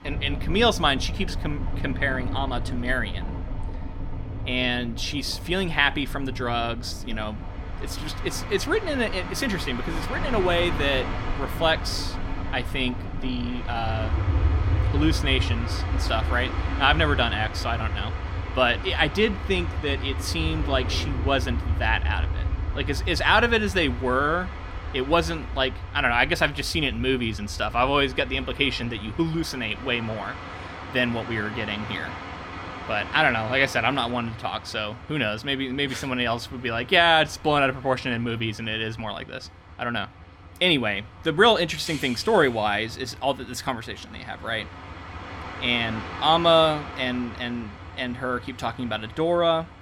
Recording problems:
train or aircraft noise; loud; throughout; 7 dB below the speech

